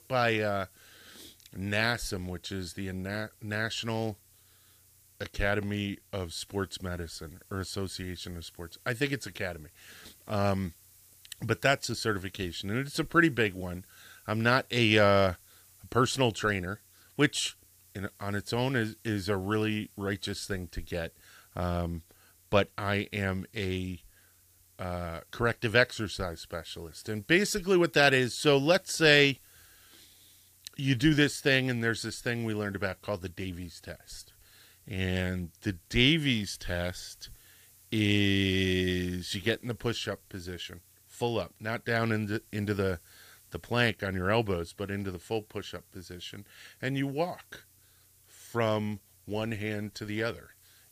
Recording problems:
hiss; faint; throughout; 30 dB below the speech

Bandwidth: 15 kHz